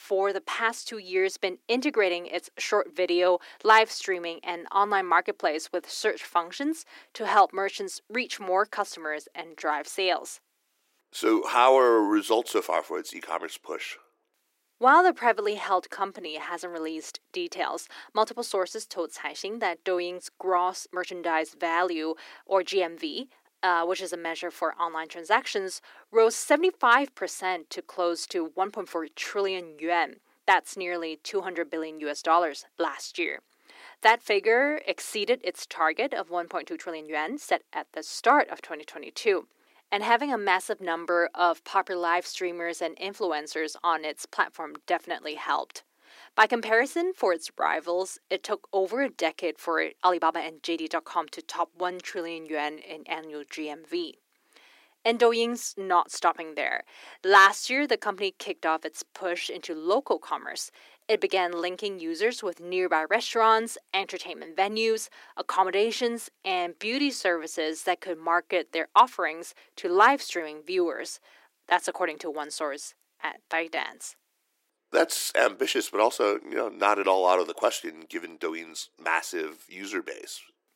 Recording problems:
thin; very; fading below 300 Hz
uneven, jittery; strongly; from 9.5 s to 1:14

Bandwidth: 16 kHz